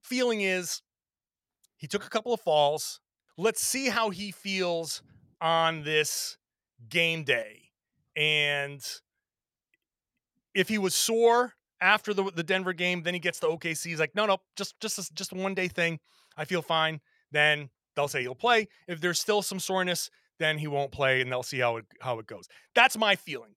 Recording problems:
none

